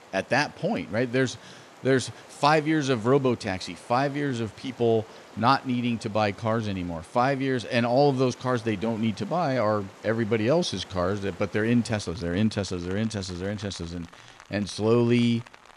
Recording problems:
rain or running water; faint; throughout; 20 dB below the speech

